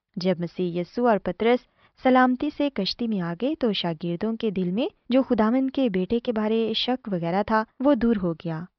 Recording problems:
high frequencies cut off; noticeable; nothing above 5.5 kHz

